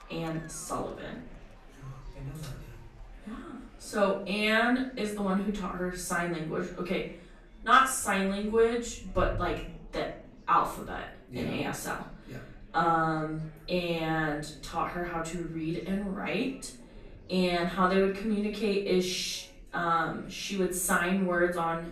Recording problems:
off-mic speech; far
room echo; noticeable; dies away in 0.4 s
murmuring crowd; faint; throughout; 25 dB below the speech

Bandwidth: 14.5 kHz